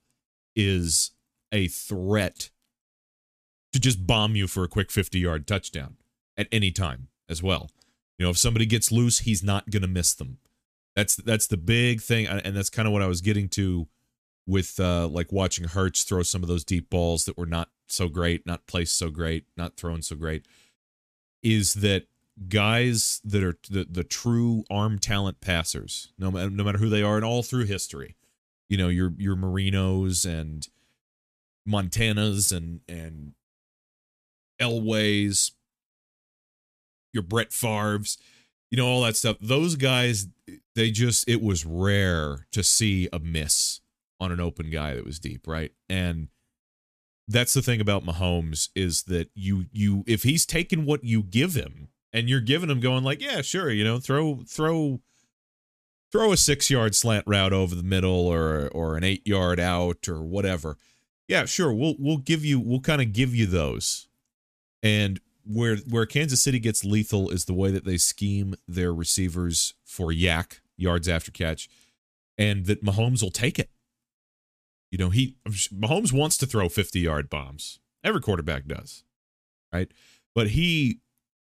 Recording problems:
none

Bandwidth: 14.5 kHz